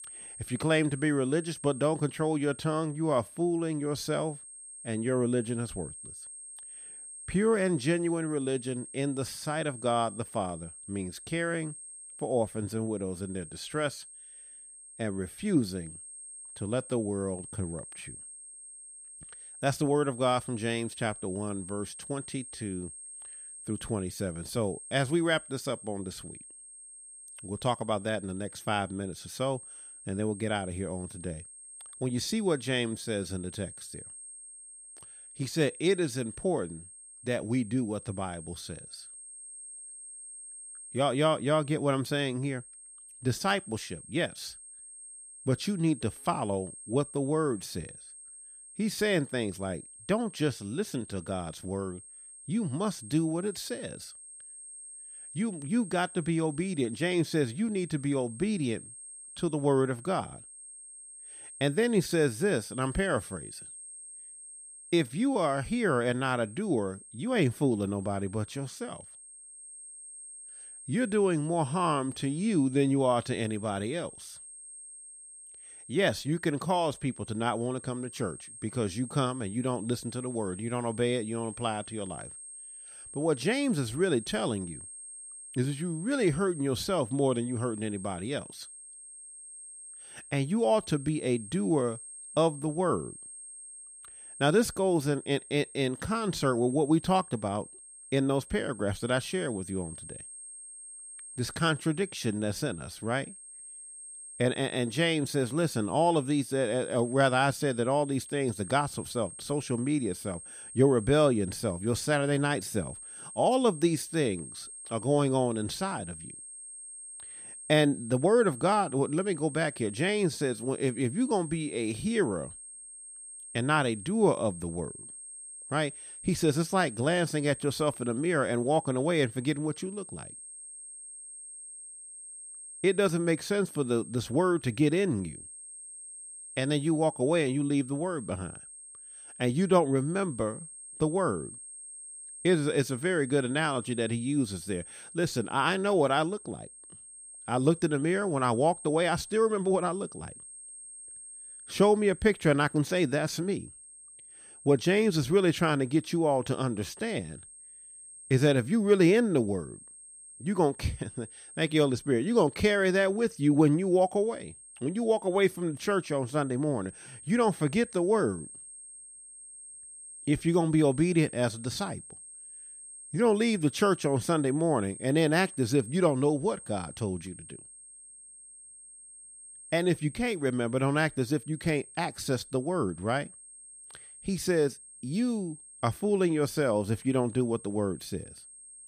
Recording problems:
high-pitched whine; noticeable; throughout; 8.5 kHz, 15 dB below the speech

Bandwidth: 15 kHz